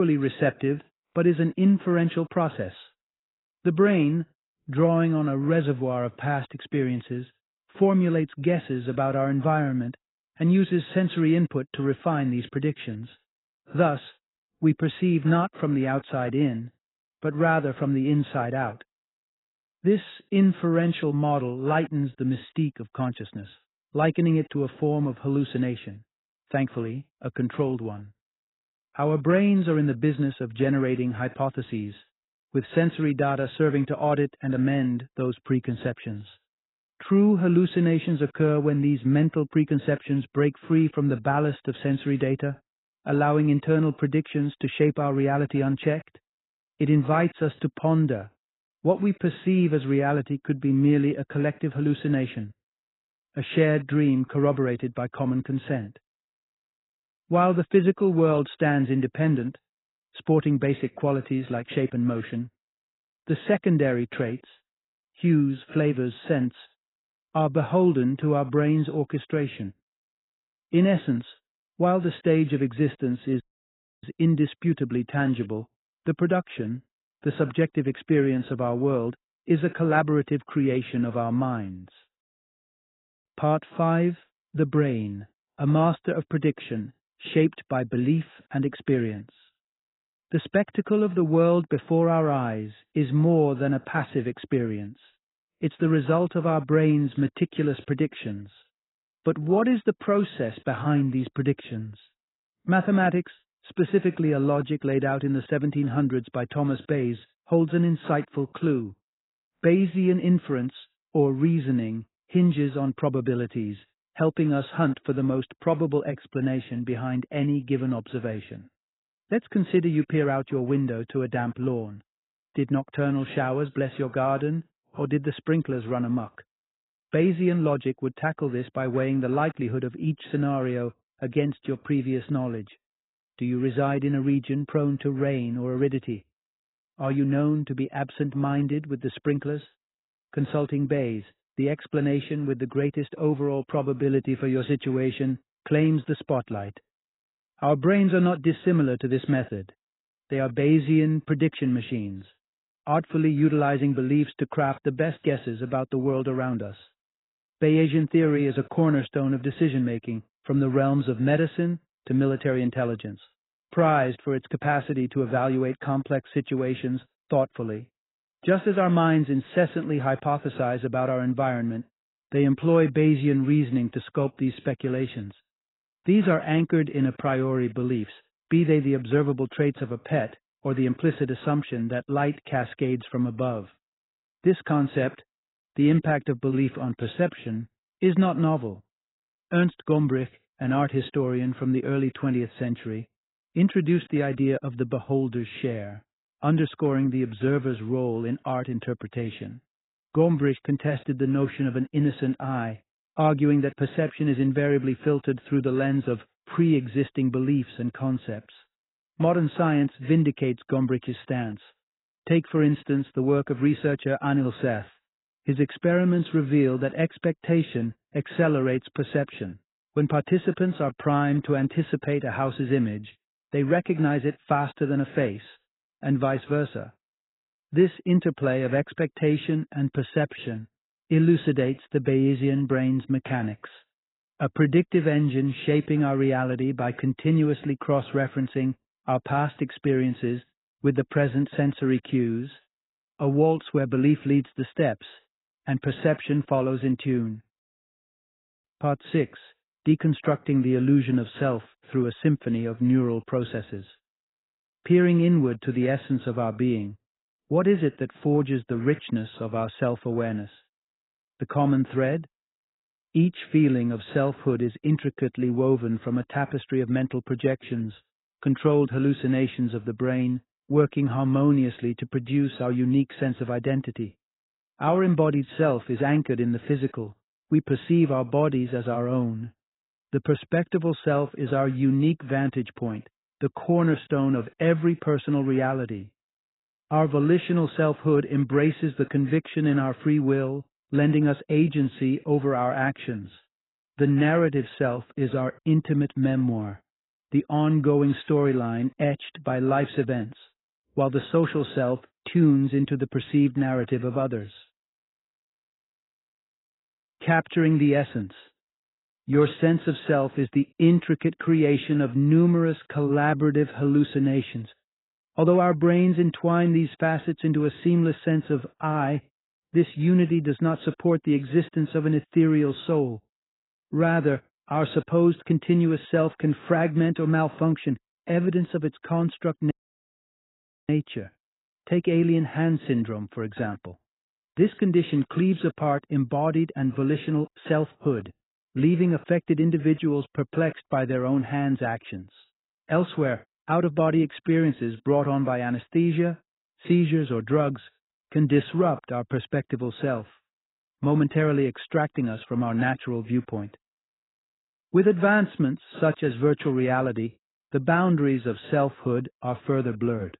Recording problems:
garbled, watery; badly; nothing above 4 kHz
abrupt cut into speech; at the start
audio cutting out; at 1:13 for 0.5 s and at 5:30 for 1 s

